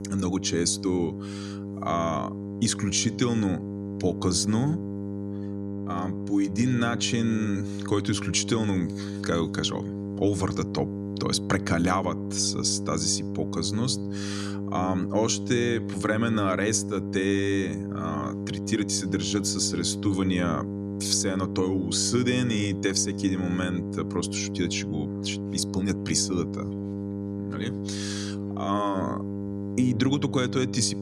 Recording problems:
electrical hum; loud; throughout; 50 Hz, 9 dB below the speech

